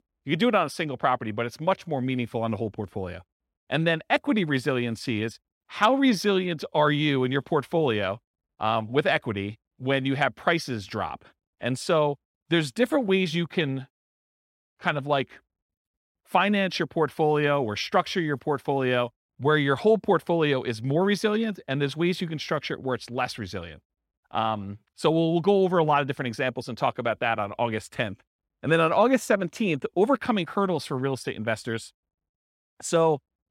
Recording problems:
none

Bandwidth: 16 kHz